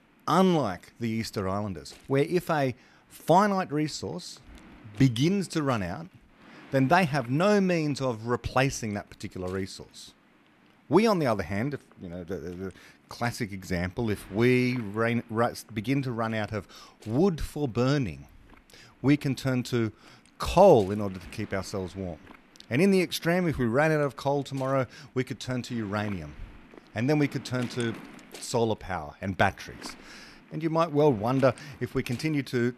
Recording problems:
wind noise on the microphone; occasional gusts; 25 dB below the speech

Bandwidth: 13.5 kHz